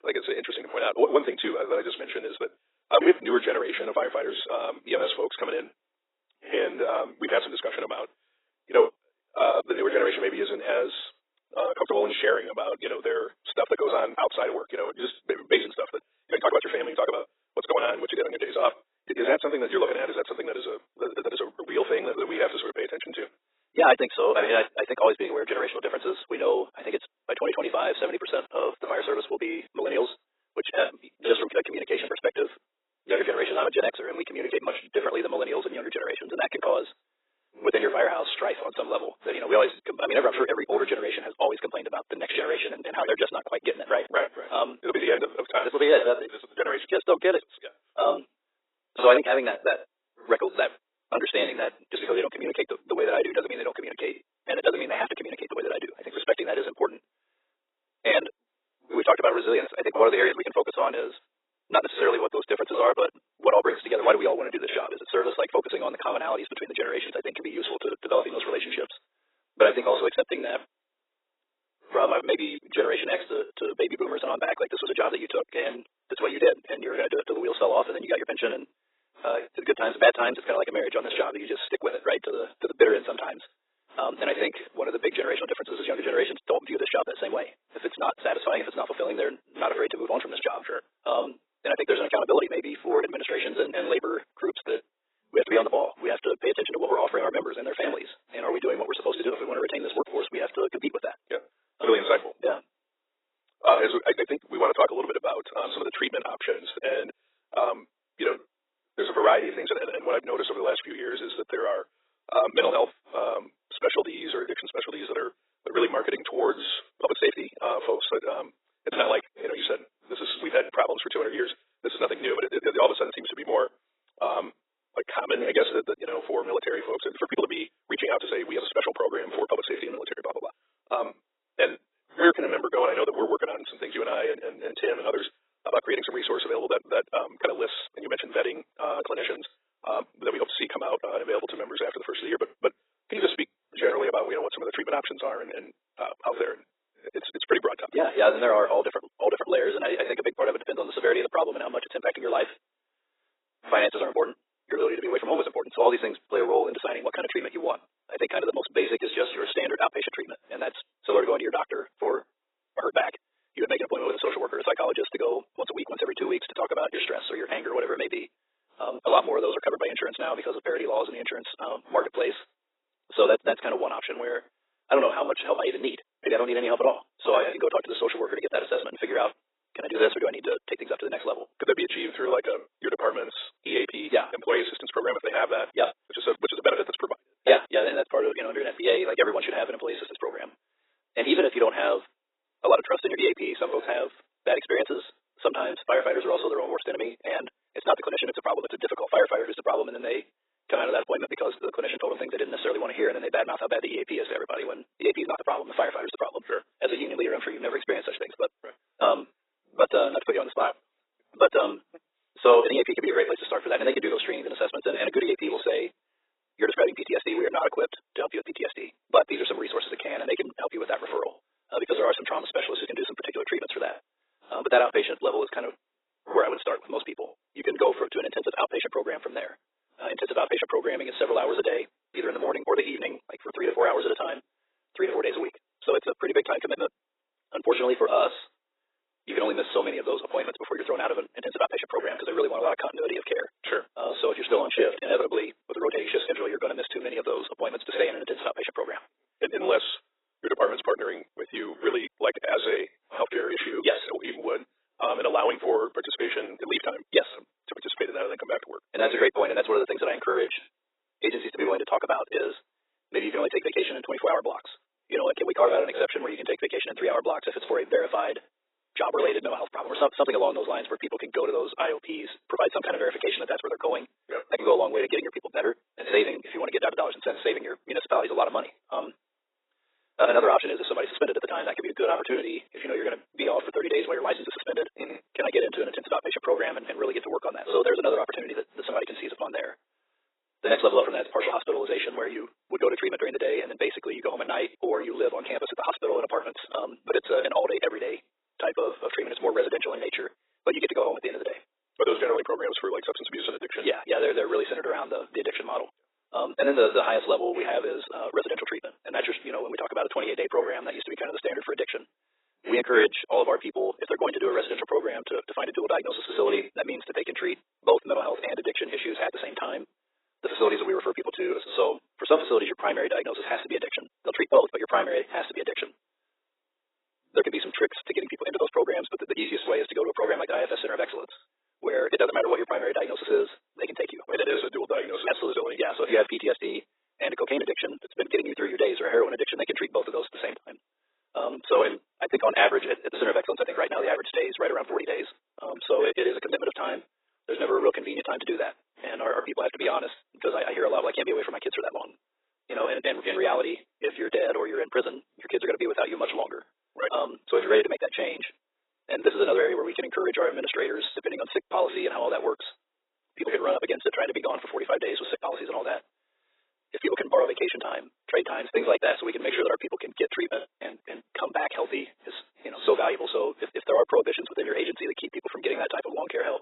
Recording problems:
garbled, watery; badly; nothing above 4 kHz
thin; very; fading below 350 Hz
wrong speed, natural pitch; too fast; 1.5 times normal speed

